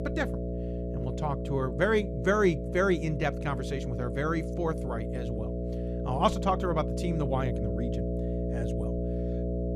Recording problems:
electrical hum; loud; throughout; 60 Hz, 8 dB below the speech

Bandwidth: 14 kHz